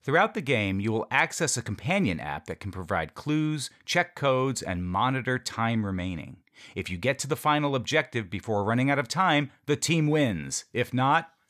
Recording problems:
none

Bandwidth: 14.5 kHz